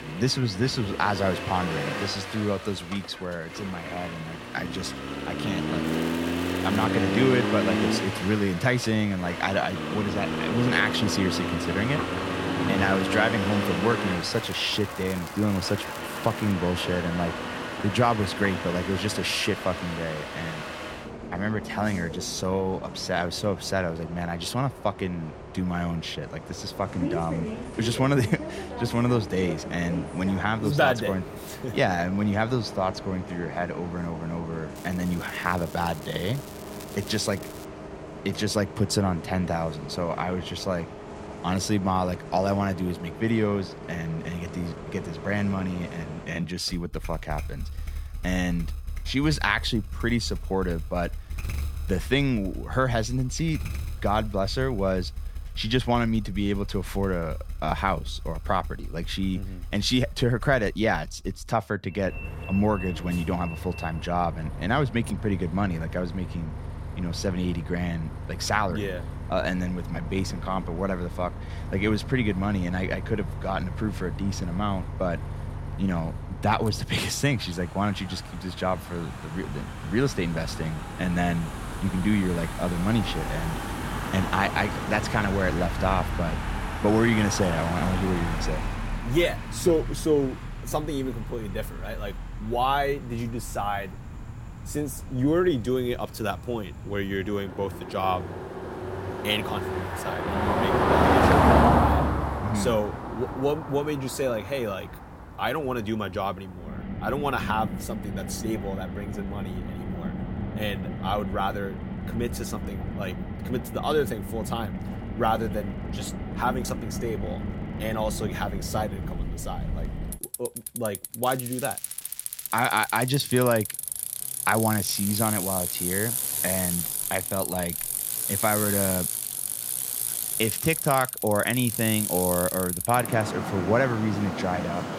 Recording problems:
traffic noise; loud; throughout; 4 dB below the speech
crackling; noticeable; 4 times, first at 6 s; 15 dB below the speech

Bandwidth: 16.5 kHz